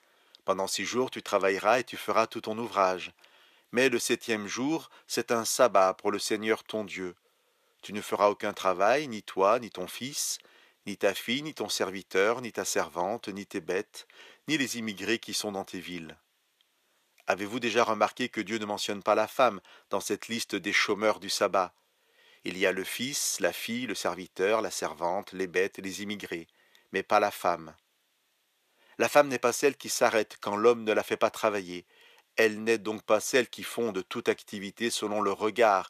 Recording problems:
thin; somewhat; fading below 400 Hz

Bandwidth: 14.5 kHz